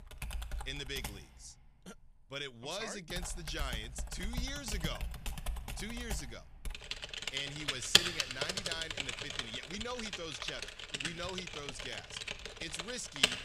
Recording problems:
household noises; very loud; throughout; 5 dB above the speech

